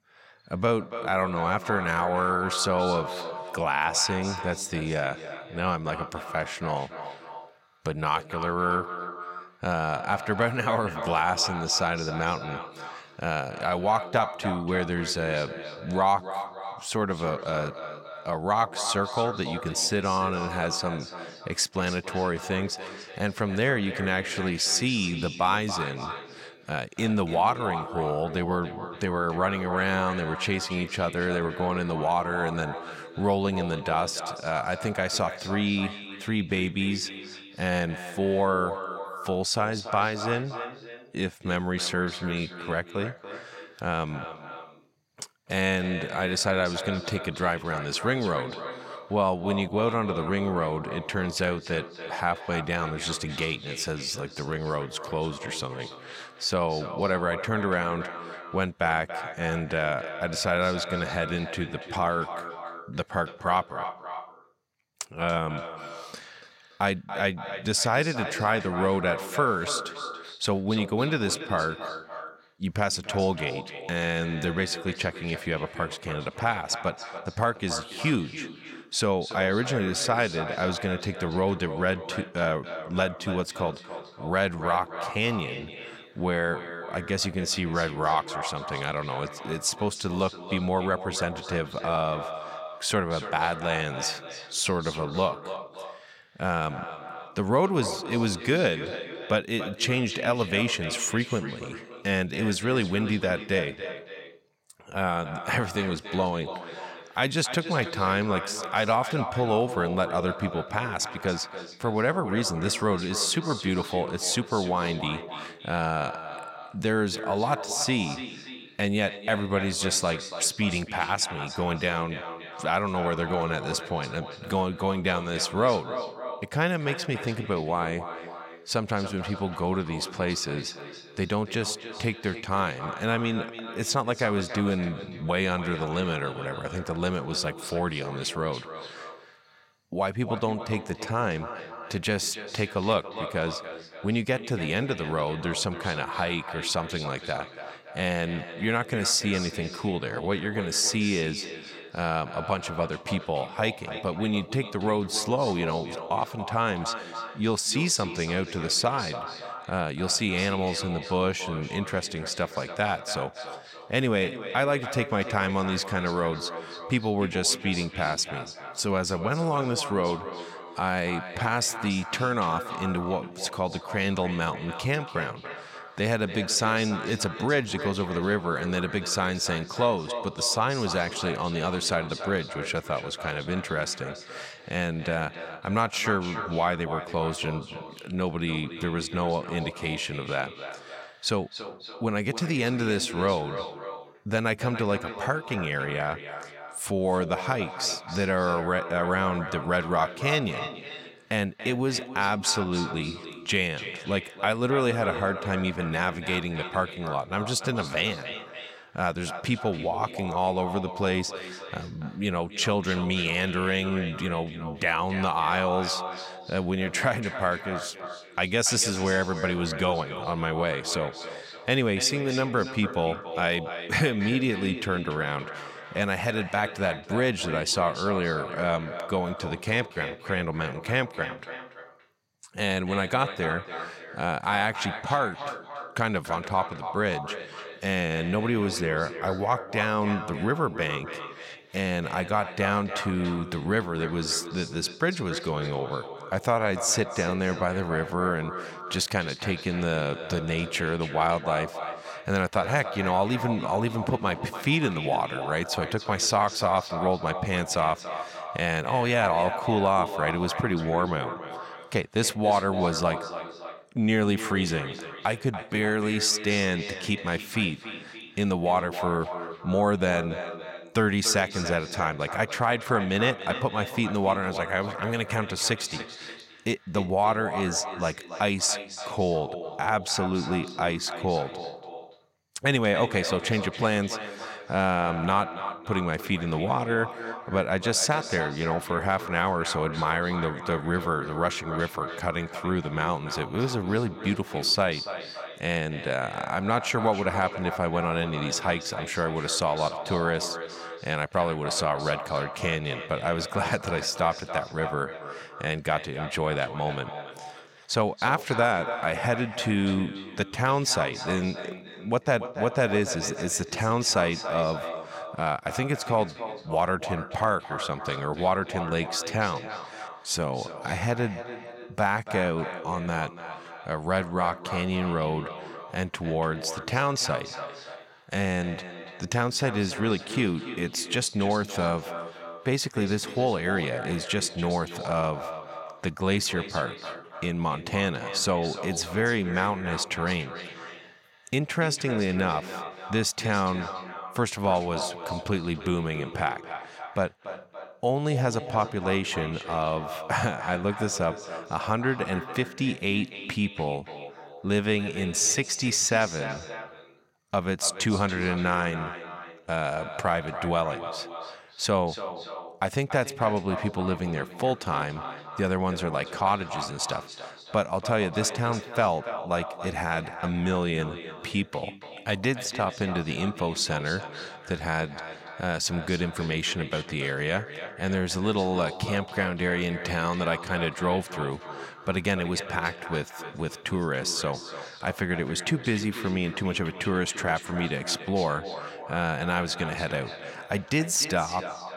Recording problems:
echo of what is said; strong; throughout; 280 ms later, 10 dB below the speech

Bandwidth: 16.5 kHz